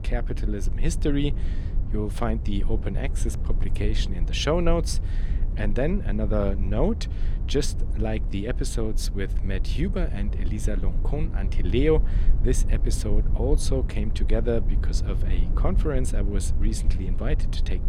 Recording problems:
low rumble; noticeable; throughout; 15 dB below the speech

